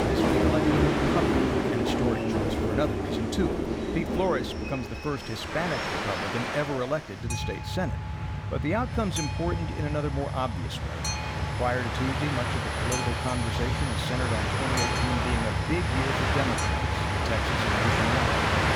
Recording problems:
train or aircraft noise; very loud; throughout; 4 dB above the speech
household noises; loud; throughout; 6 dB below the speech

